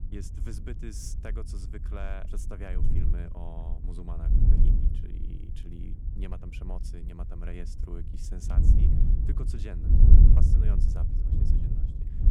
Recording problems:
wind noise on the microphone; heavy; 3 dB above the speech

